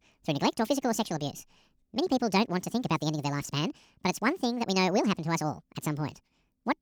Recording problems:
wrong speed and pitch; too fast and too high; 1.7 times normal speed

